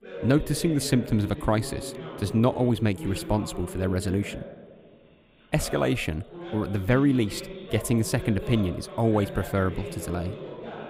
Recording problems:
voice in the background; noticeable; throughout; 10 dB below the speech

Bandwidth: 15.5 kHz